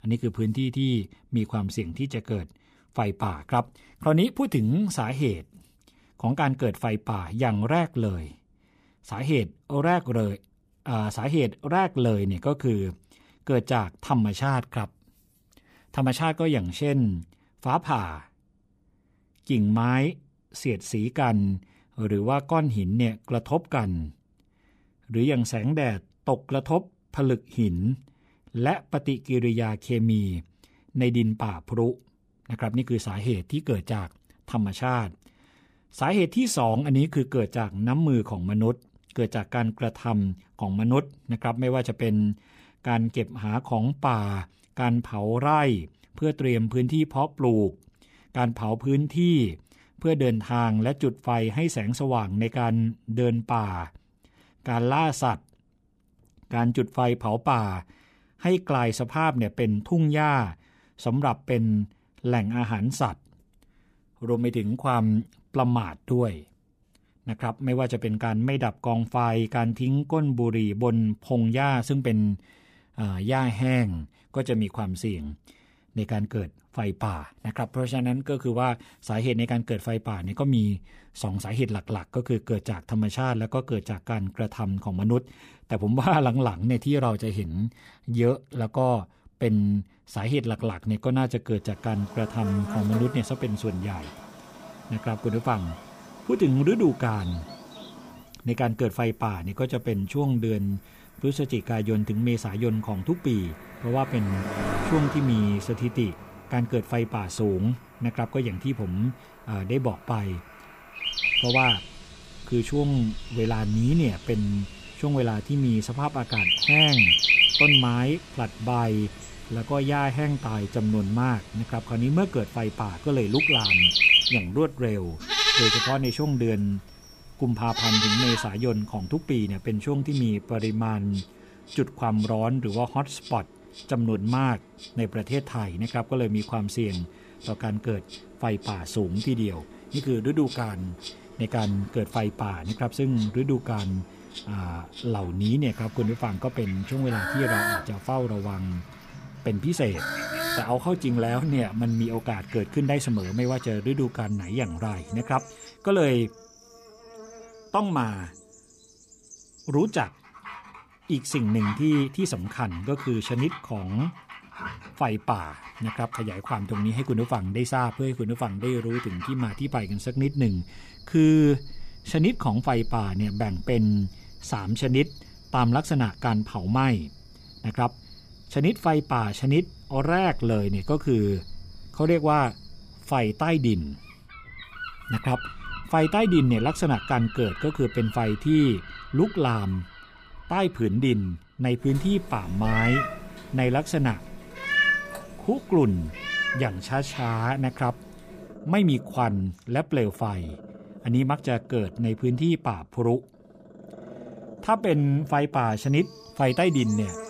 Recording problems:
animal sounds; very loud; from 1:32 on; 2 dB above the speech

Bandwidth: 15 kHz